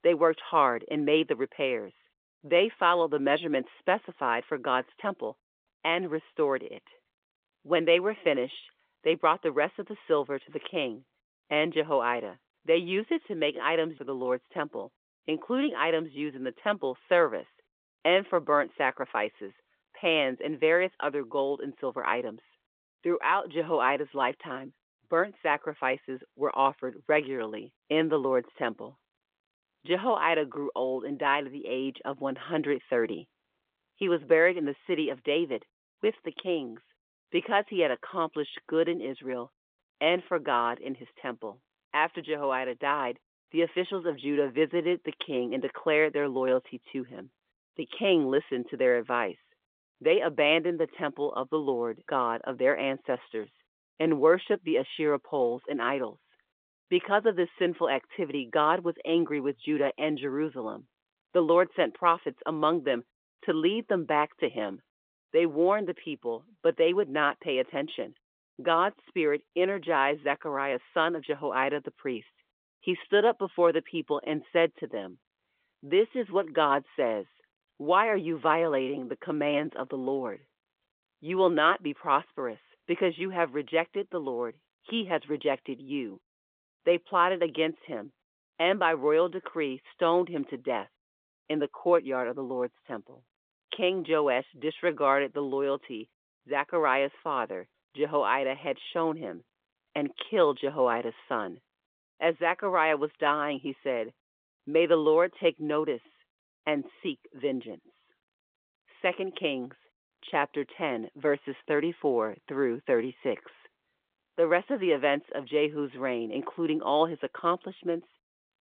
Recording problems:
phone-call audio; nothing above 3.5 kHz

